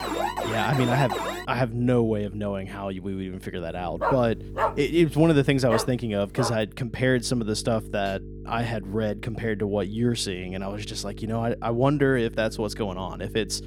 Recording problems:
electrical hum; faint; throughout; 50 Hz, 20 dB below the speech
alarm; noticeable; until 1.5 s; peak 2 dB below the speech
dog barking; noticeable; from 4 to 6.5 s; peak 2 dB below the speech

